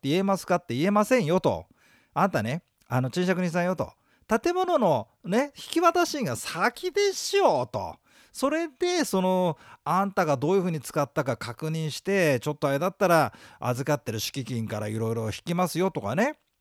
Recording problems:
none

